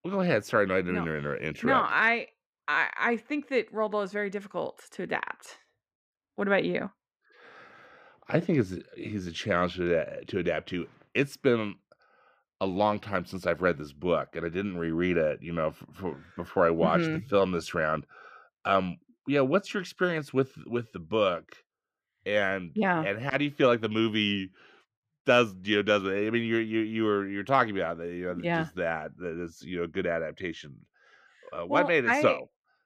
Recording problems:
muffled; slightly; fading above 3.5 kHz

